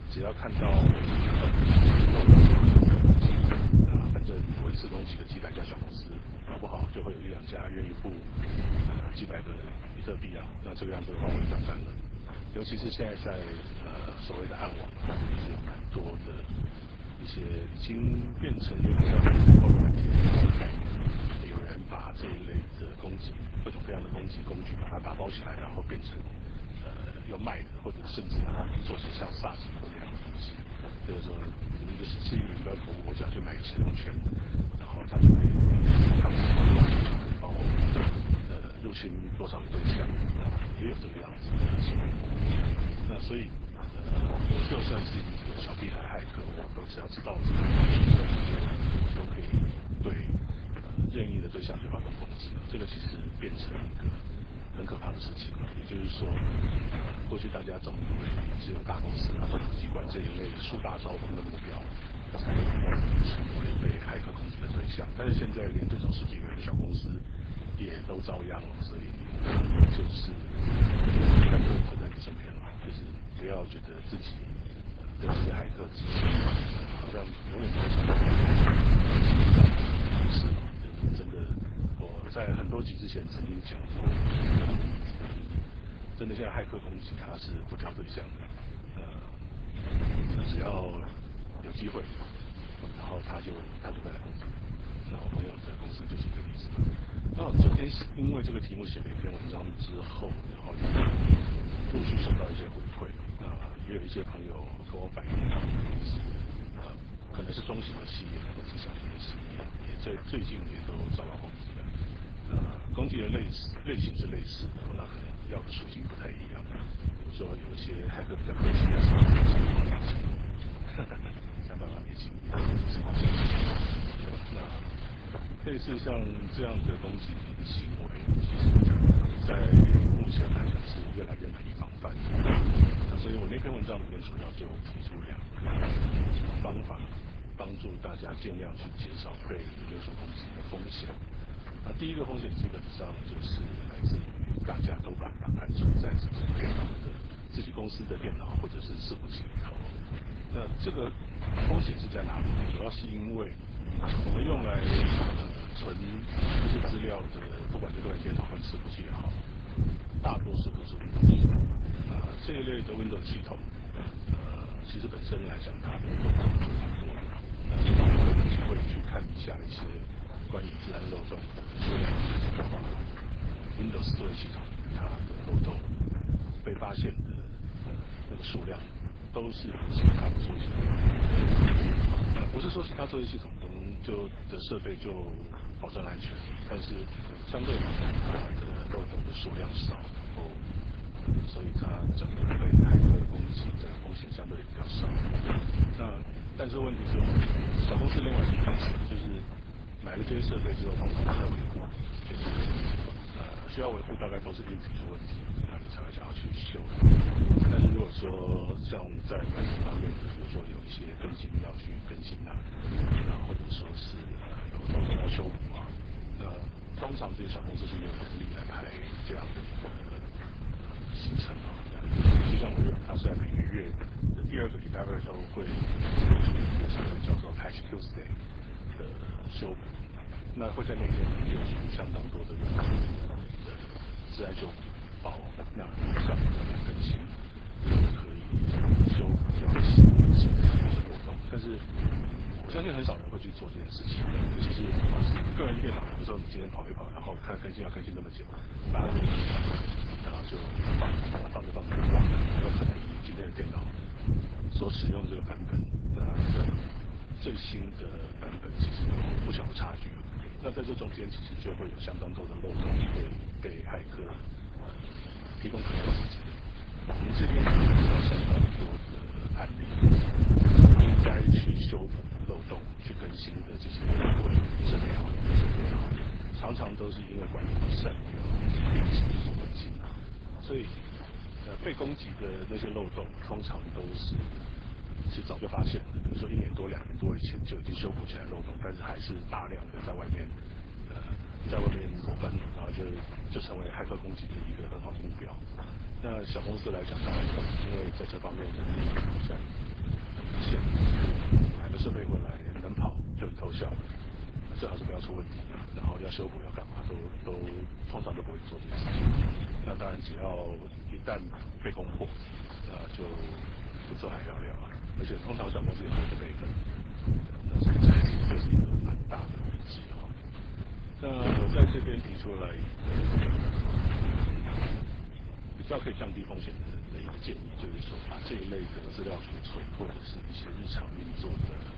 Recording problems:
garbled, watery; badly
wind noise on the microphone; heavy; 3 dB above the speech
keyboard typing; loud; at 4:52; peak 1 dB above the speech

